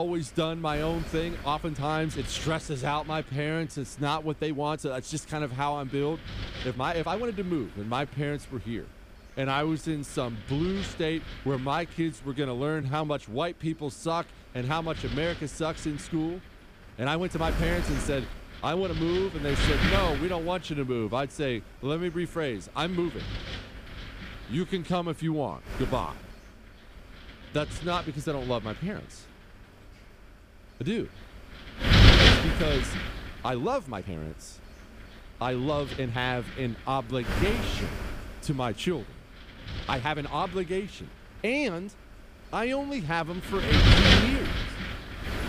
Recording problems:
wind noise on the microphone; heavy; 2 dB above the speech
abrupt cut into speech; at the start
uneven, jittery; strongly; from 1.5 to 44 s

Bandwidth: 15 kHz